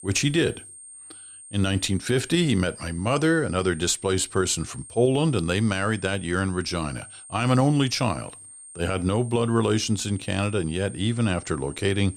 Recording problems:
high-pitched whine; noticeable; throughout; 8.5 kHz, 15 dB below the speech

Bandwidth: 15.5 kHz